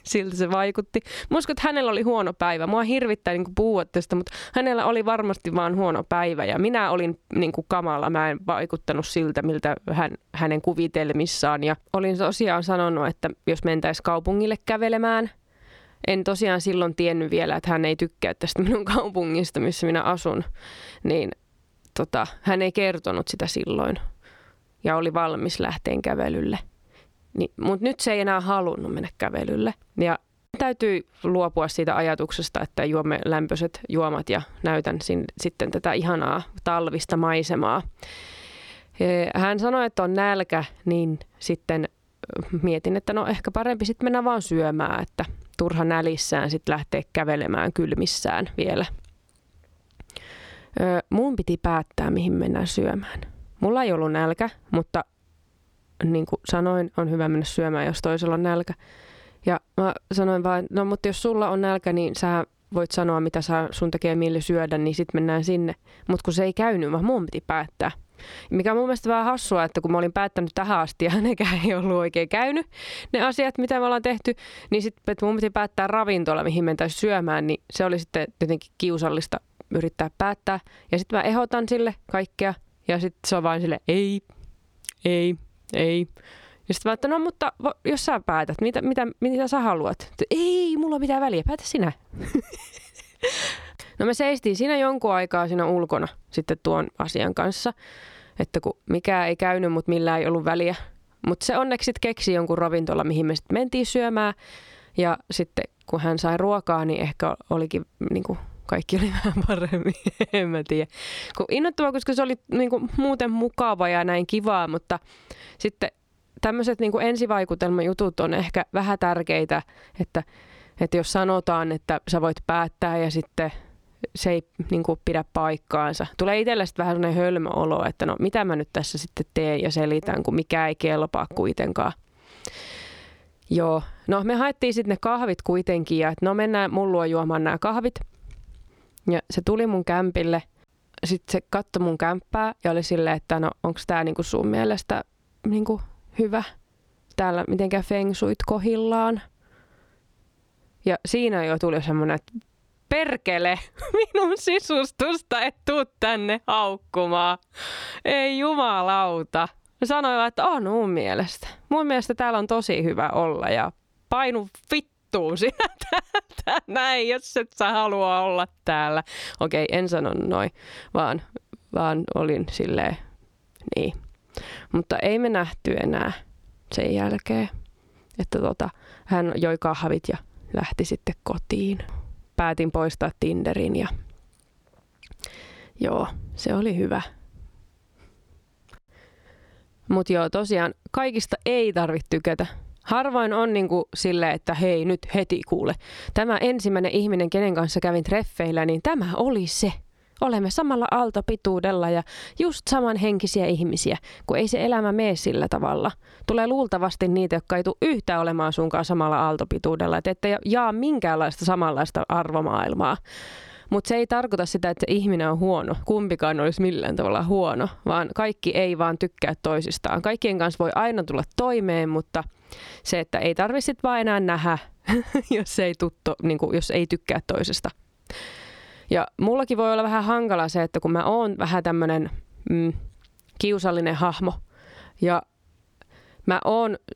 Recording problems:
squashed, flat; somewhat

